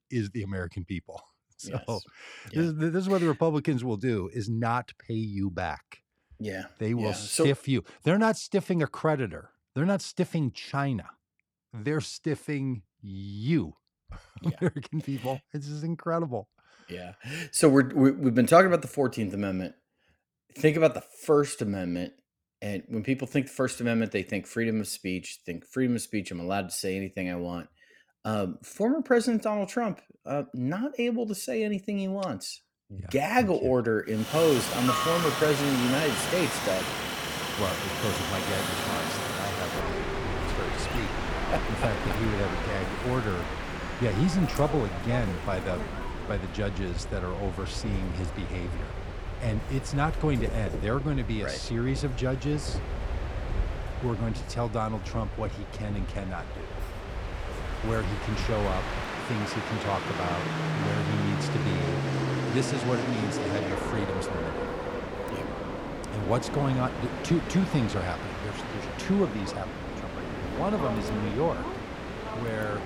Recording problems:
train or aircraft noise; loud; from 34 s on; 4 dB below the speech

